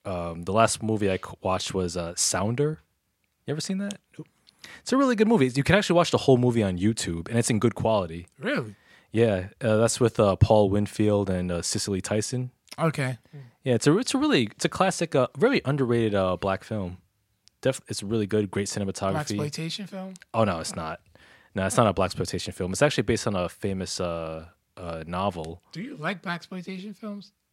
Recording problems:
none

